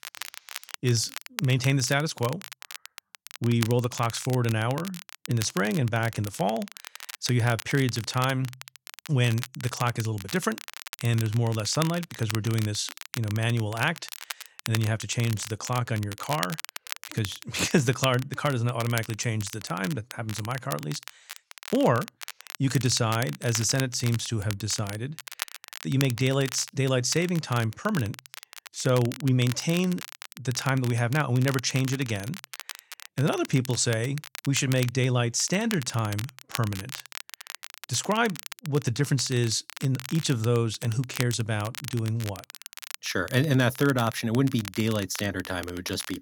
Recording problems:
crackle, like an old record; noticeable; 10 dB below the speech

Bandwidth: 17 kHz